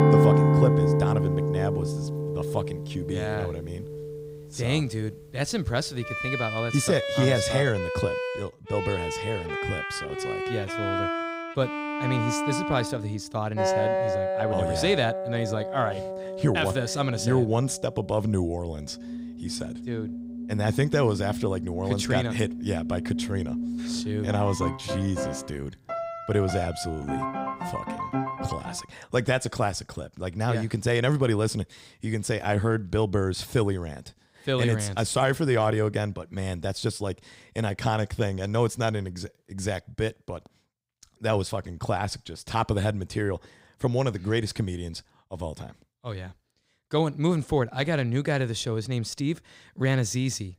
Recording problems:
background music; loud; until 29 s; 1 dB below the speech

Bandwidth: 15.5 kHz